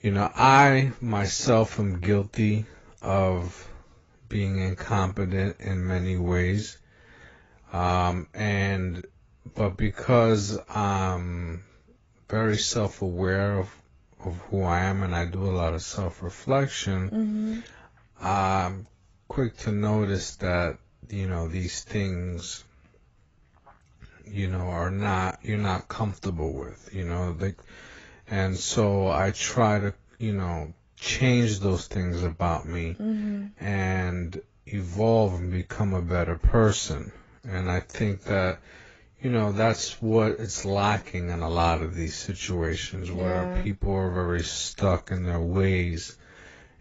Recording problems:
garbled, watery; badly; nothing above 7.5 kHz
wrong speed, natural pitch; too slow; 0.6 times normal speed

